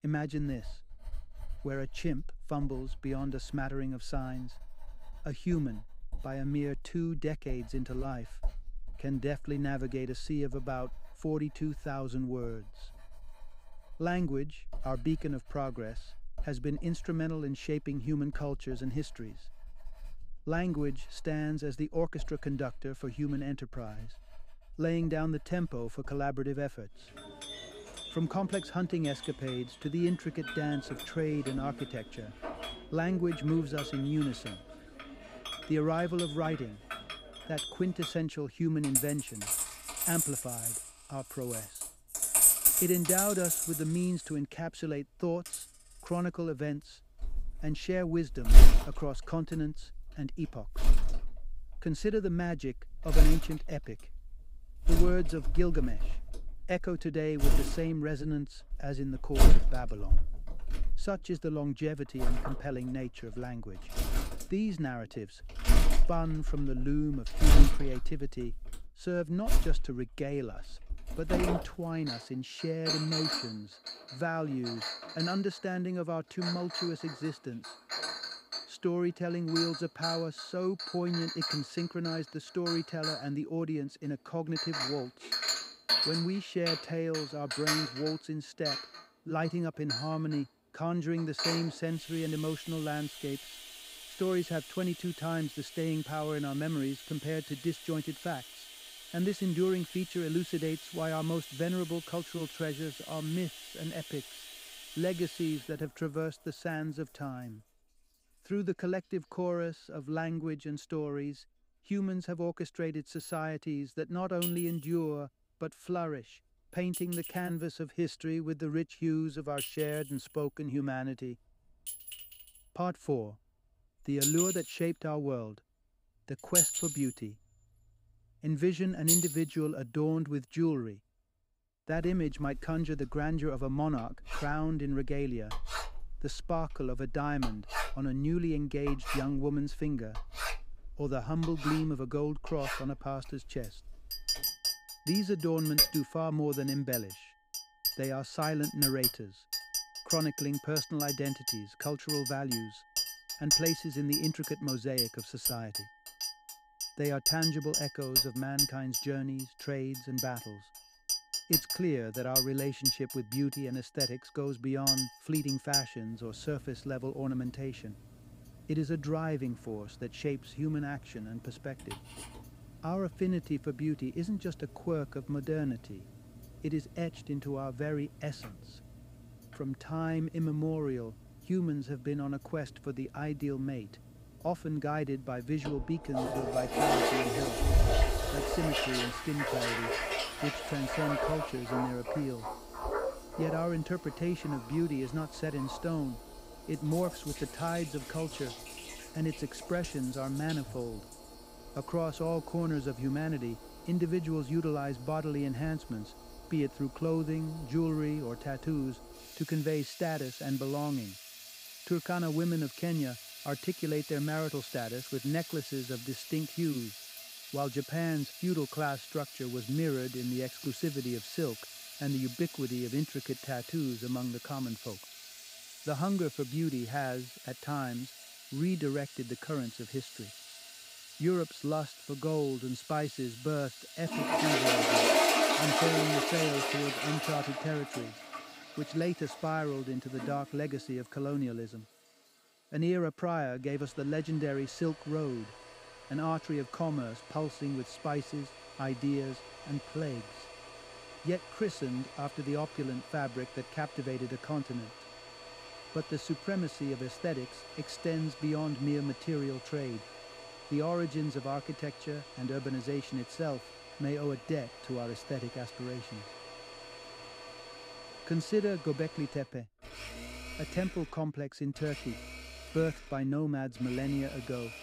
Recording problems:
household noises; very loud; throughout; as loud as the speech

